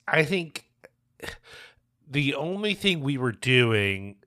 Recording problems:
uneven, jittery; strongly

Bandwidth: 15 kHz